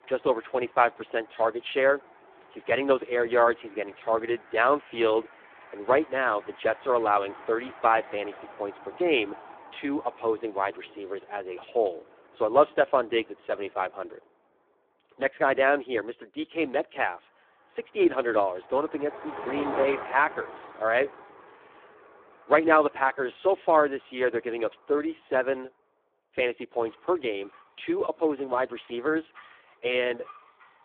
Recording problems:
phone-call audio; poor line
traffic noise; noticeable; throughout; 20 dB below the speech

